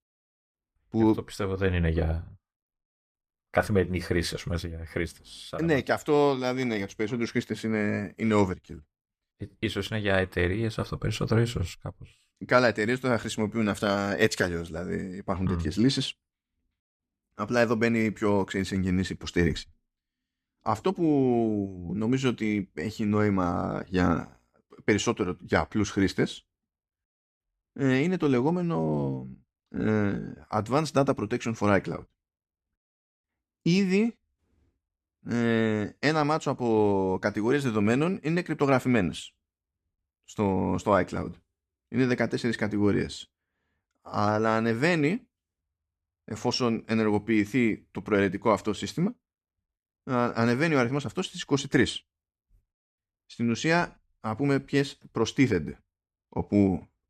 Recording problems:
none

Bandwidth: 14.5 kHz